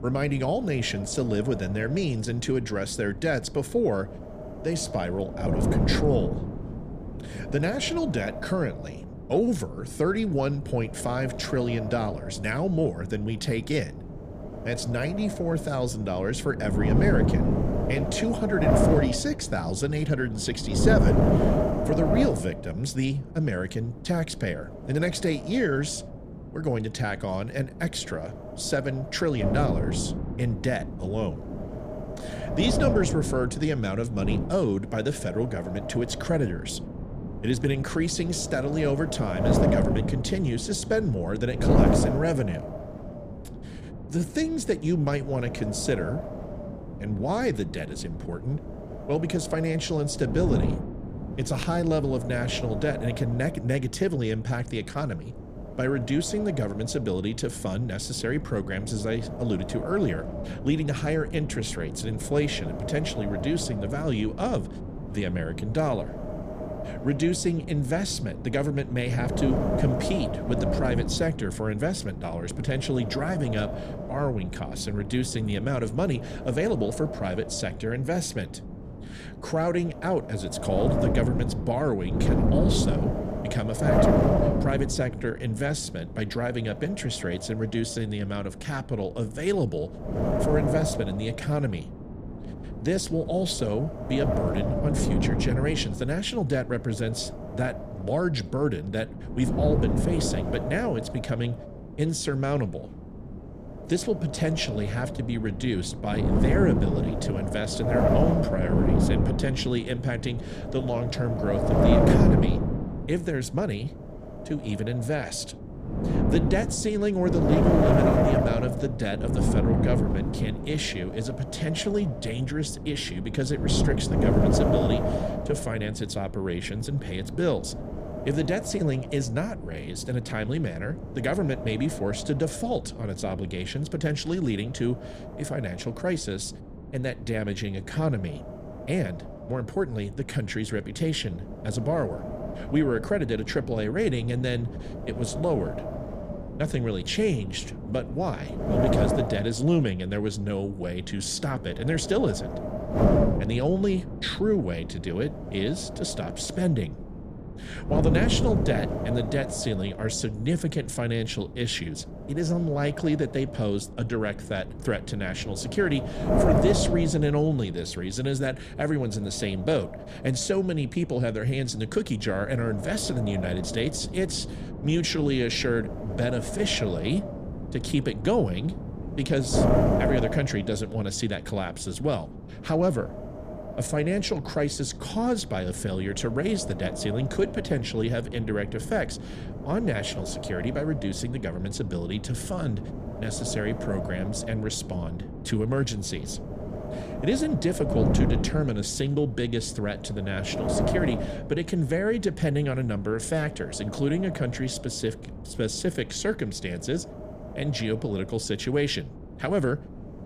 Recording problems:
wind noise on the microphone; heavy; 2 dB below the speech

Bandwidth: 14.5 kHz